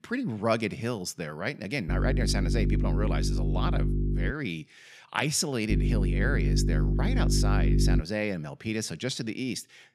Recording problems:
electrical hum; loud; from 2 to 4.5 s and from 5.5 to 8 s; 50 Hz, 5 dB below the speech

